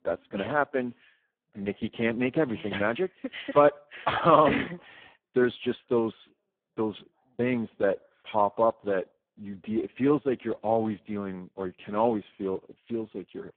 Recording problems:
phone-call audio; poor line

